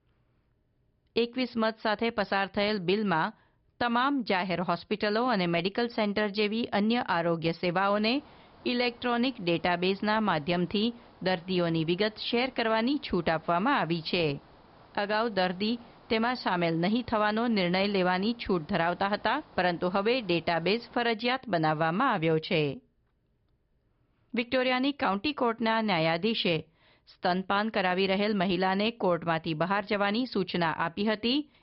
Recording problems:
high frequencies cut off; noticeable; nothing above 5 kHz
hiss; faint; from 8 to 21 s; 25 dB below the speech

